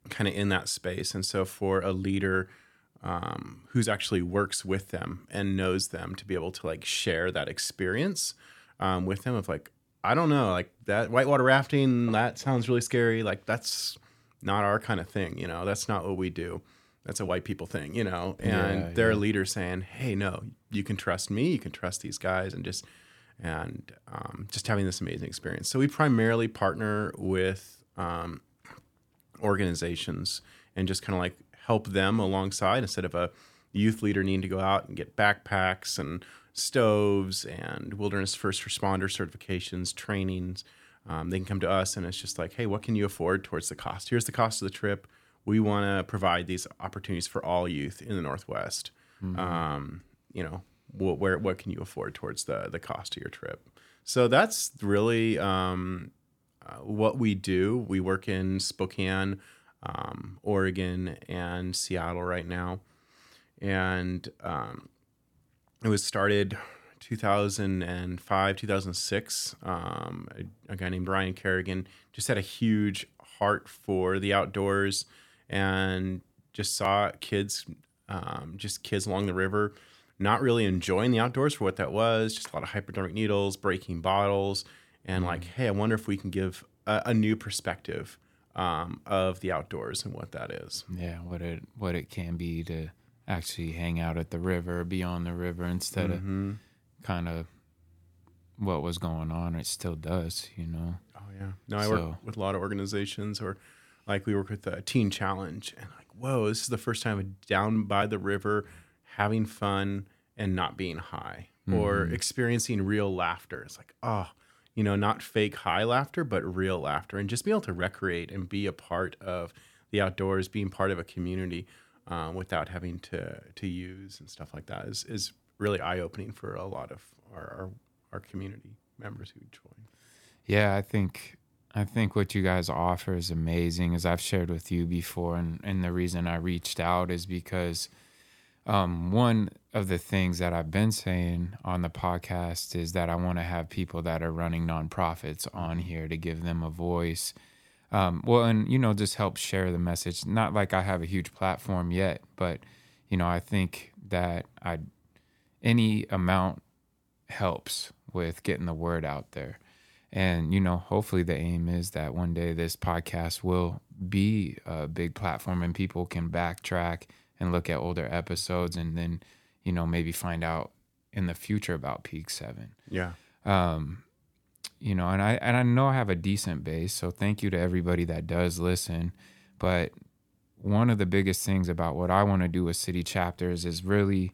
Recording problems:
none

